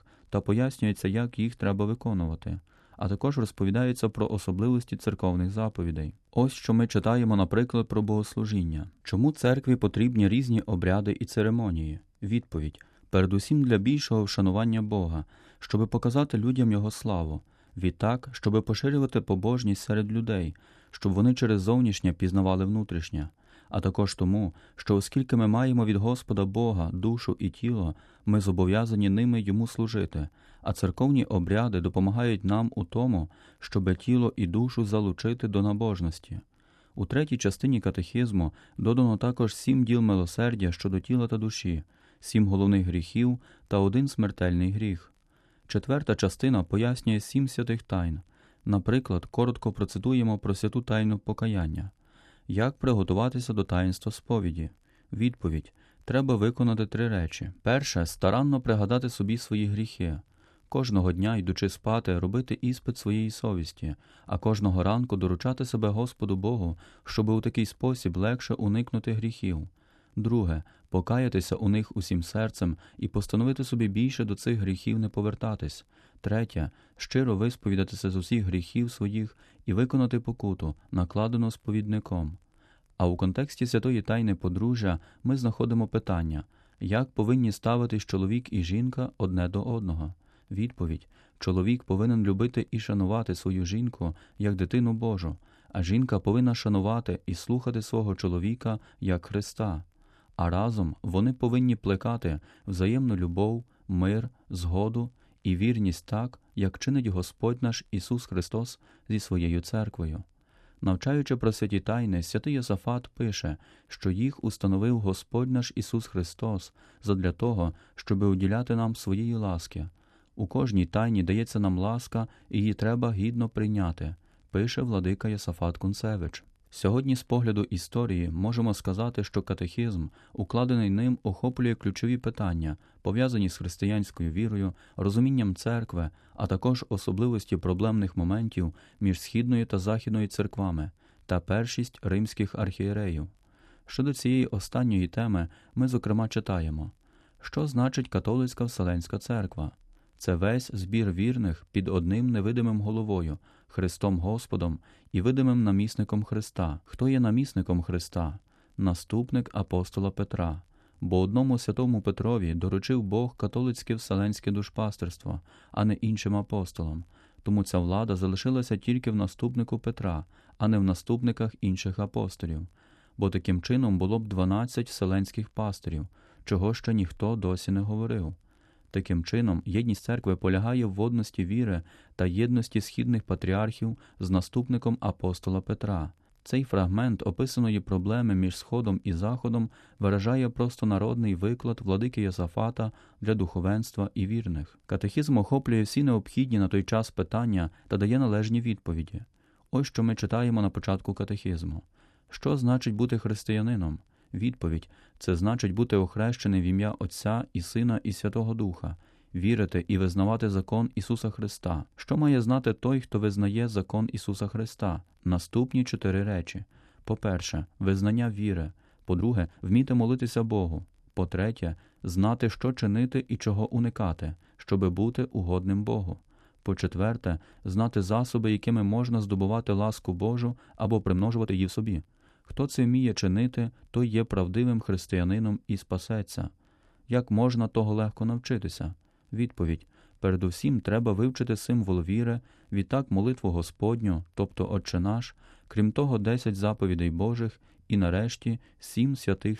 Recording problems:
uneven, jittery; strongly; from 51 s to 3:52

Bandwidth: 13.5 kHz